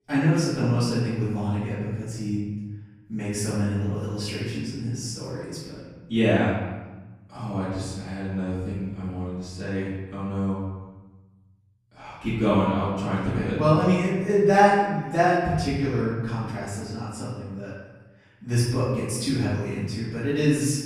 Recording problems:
room echo; strong; dies away in 1.2 s
off-mic speech; far

